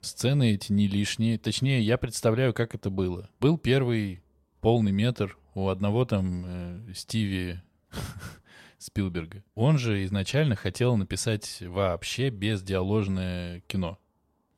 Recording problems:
none

